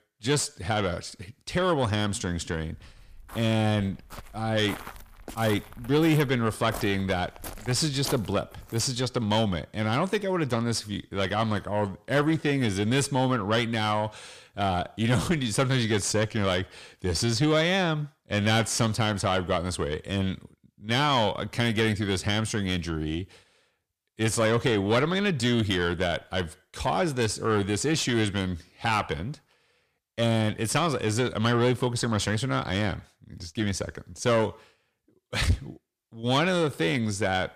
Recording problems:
distortion; slight; 10 dB below the speech
footsteps; noticeable; from 2.5 to 9 s; peak 9 dB below the speech

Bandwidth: 15 kHz